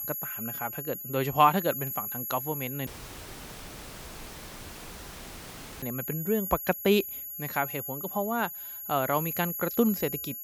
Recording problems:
high-pitched whine; loud; throughout; 11.5 kHz, 5 dB below the speech
audio cutting out; at 3 s for 3 s

